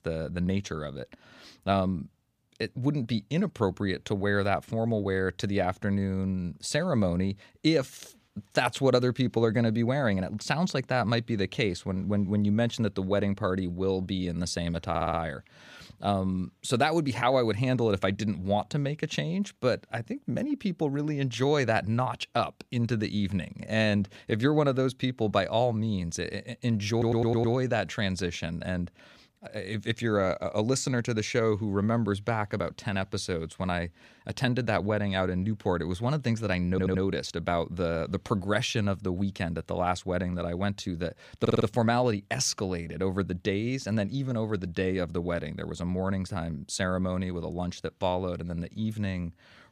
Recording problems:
audio stuttering; 4 times, first at 15 s

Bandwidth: 15 kHz